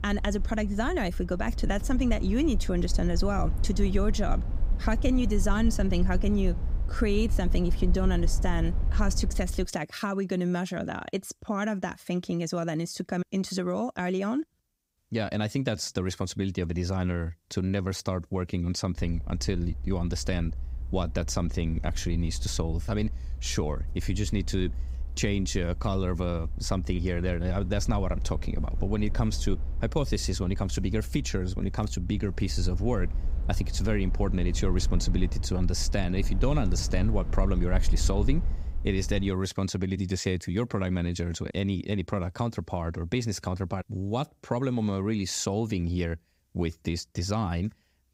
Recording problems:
low rumble; noticeable; until 9.5 s and from 19 to 39 s; 15 dB below the speech

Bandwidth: 15.5 kHz